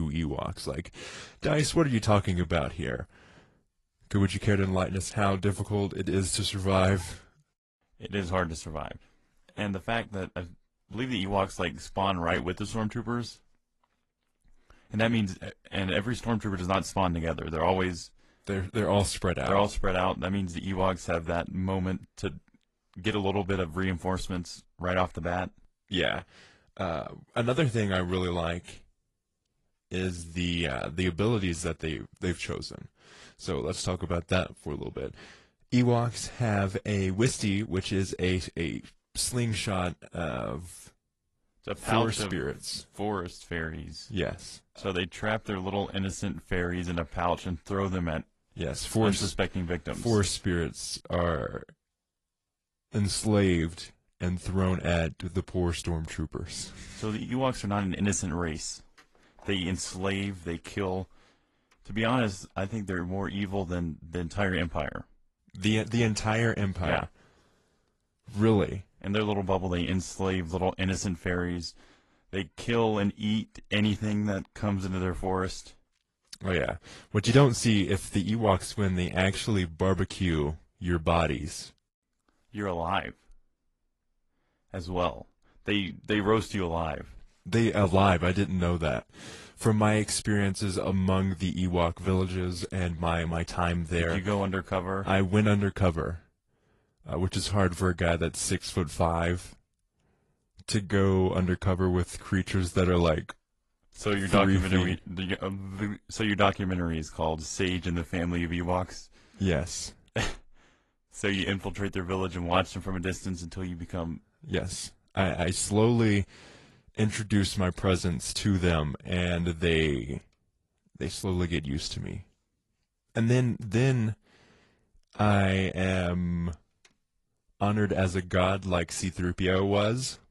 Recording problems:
garbled, watery; slightly; nothing above 11 kHz
abrupt cut into speech; at the start

